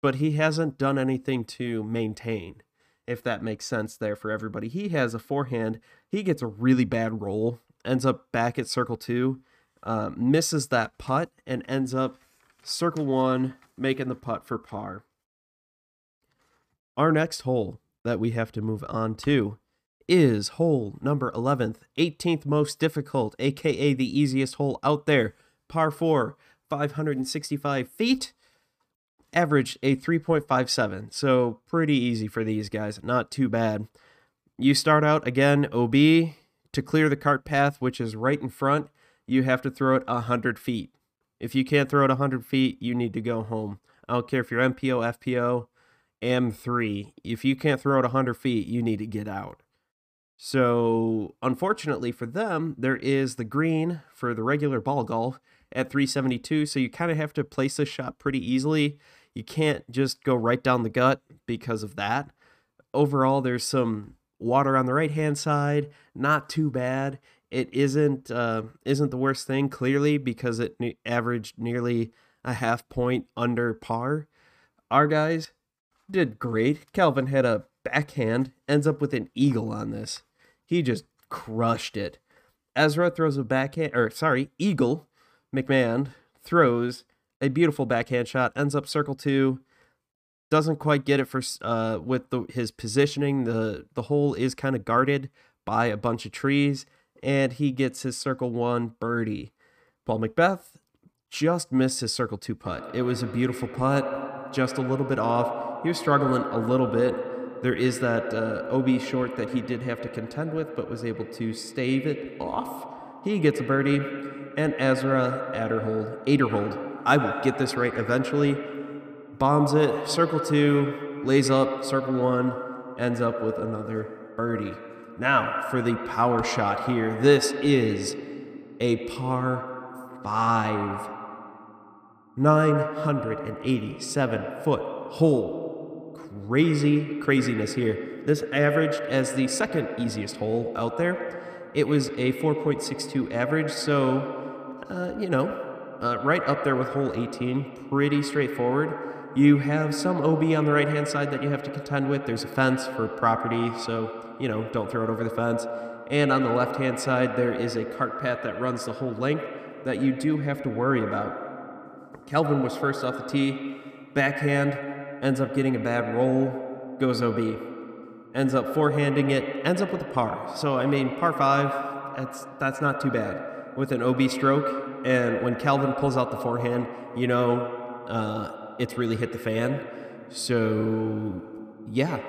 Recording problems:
echo of what is said; strong; from 1:43 on; 90 ms later, 8 dB below the speech

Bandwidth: 15 kHz